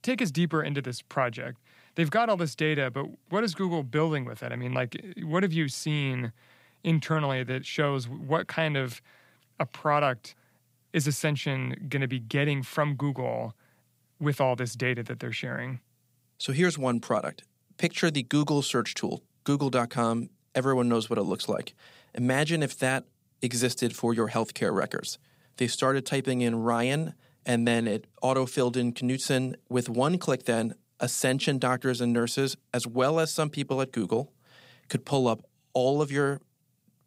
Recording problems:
none

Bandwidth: 15.5 kHz